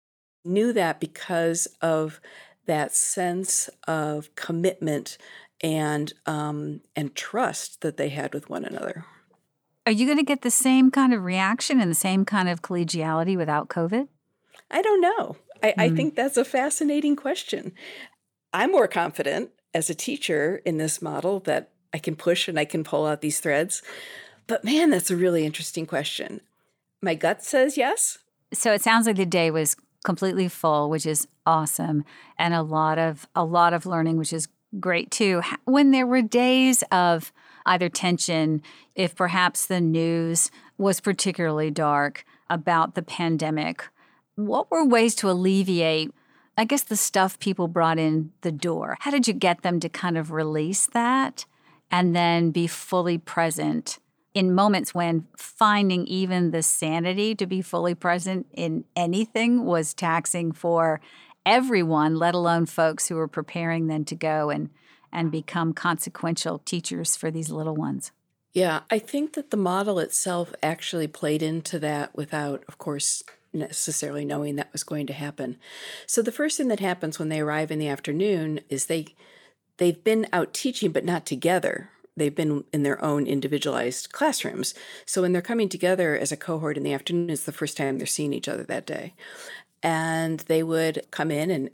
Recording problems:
uneven, jittery; strongly; from 2.5 s to 1:30

